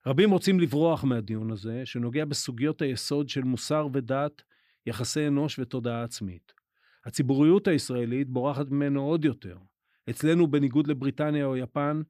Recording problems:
none

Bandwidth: 15 kHz